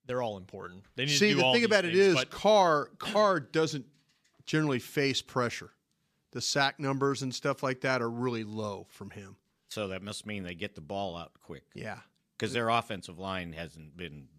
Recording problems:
none

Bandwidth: 14.5 kHz